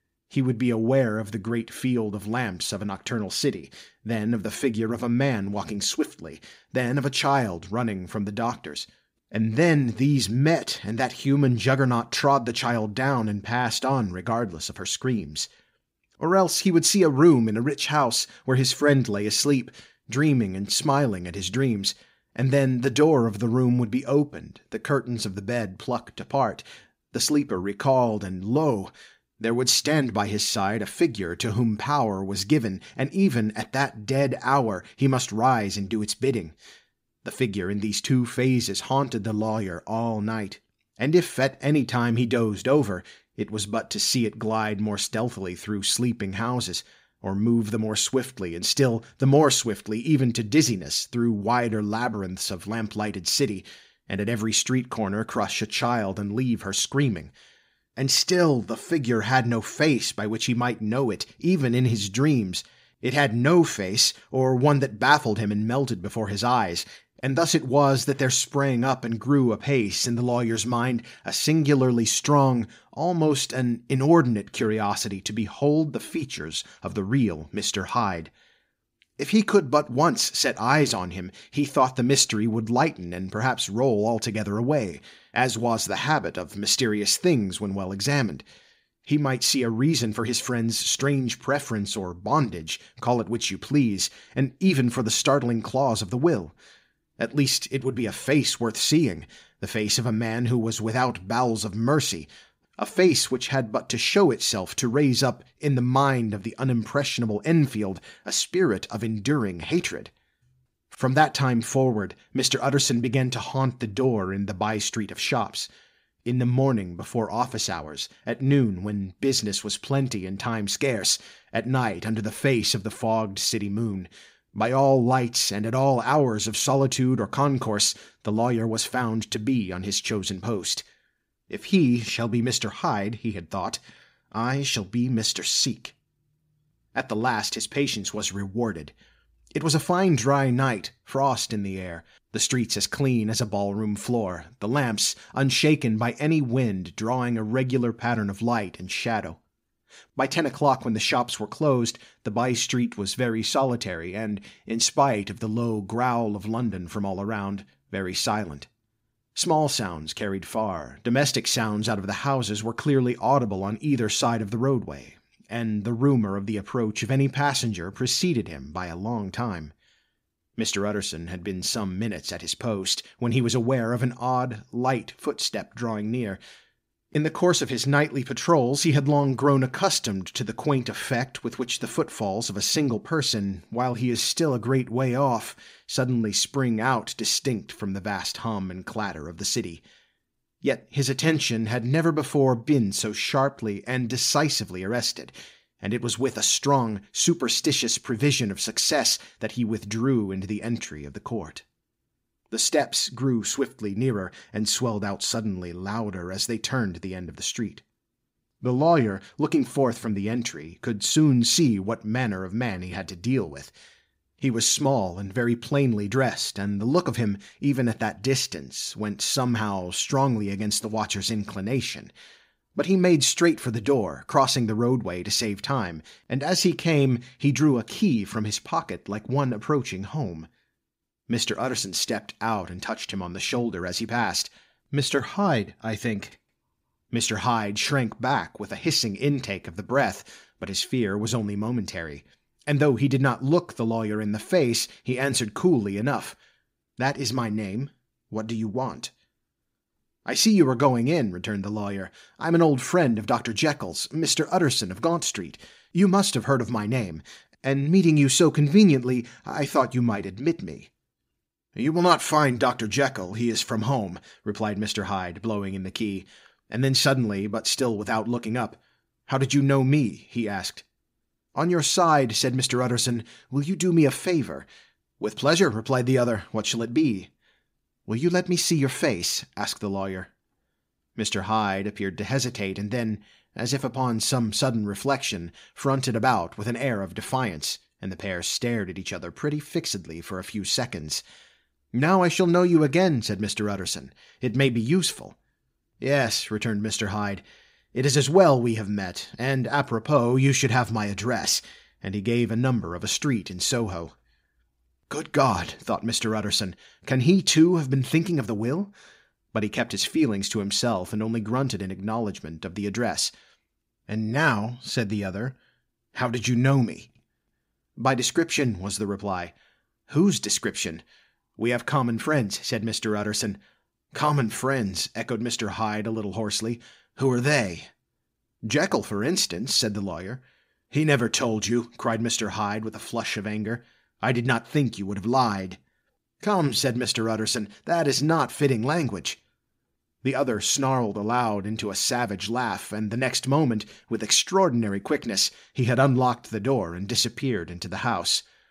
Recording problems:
none

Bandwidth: 15.5 kHz